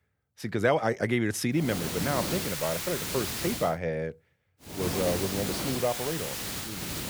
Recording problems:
hiss; loud; from 1.5 to 3.5 s and from 4.5 s on; 2 dB below the speech

